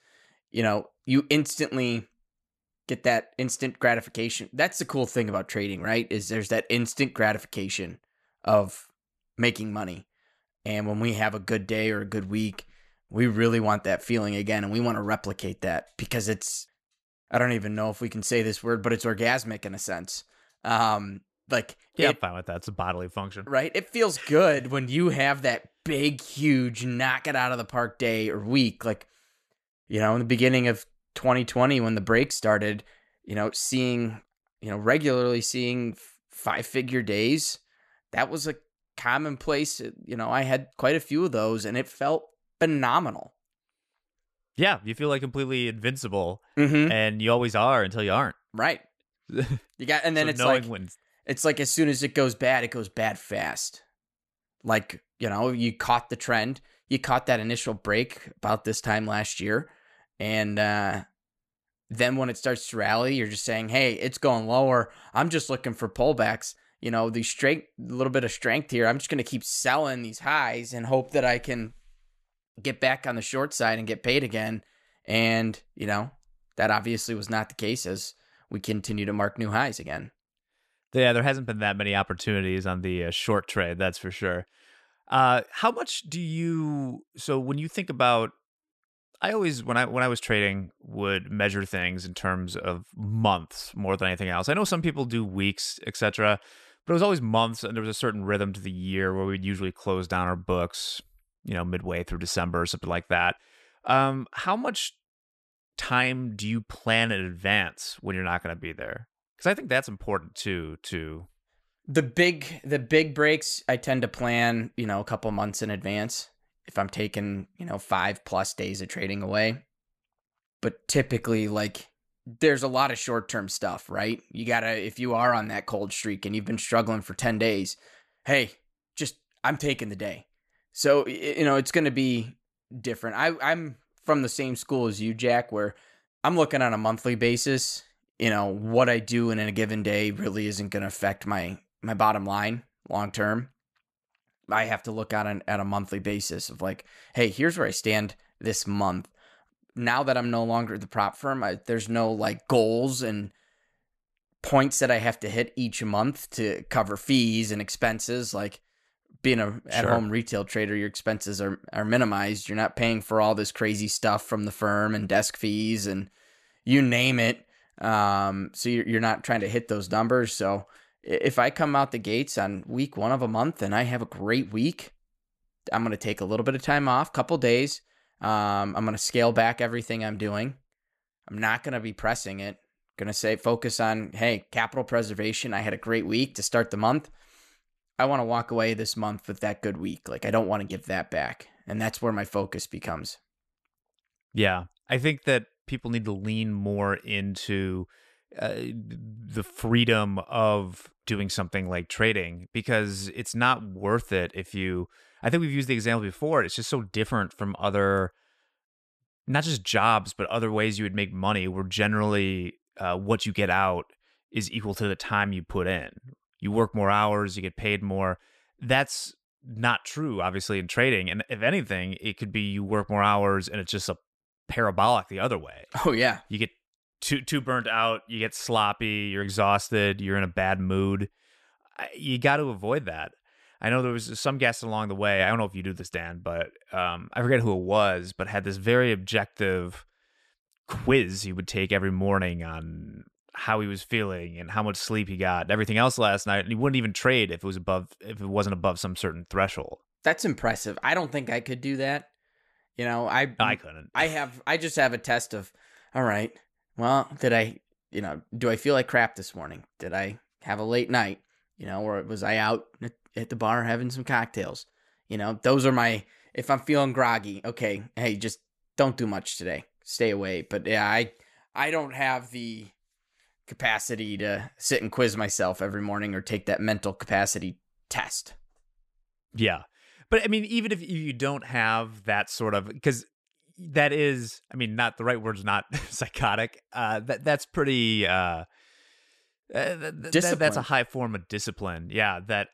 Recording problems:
none

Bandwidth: 13.5 kHz